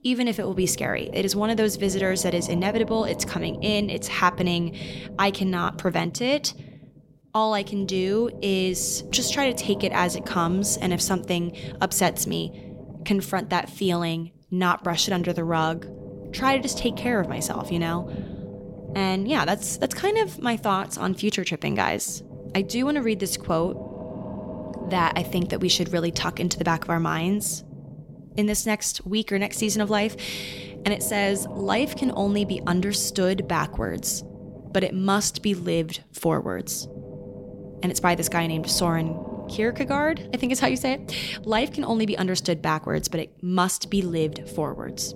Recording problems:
low rumble; noticeable; throughout; 15 dB below the speech

